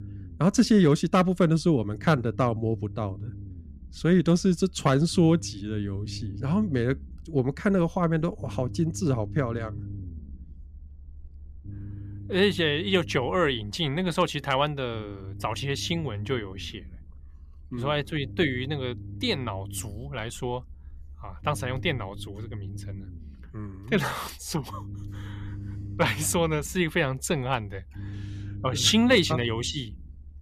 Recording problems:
low rumble; faint; throughout; 25 dB below the speech

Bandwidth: 14.5 kHz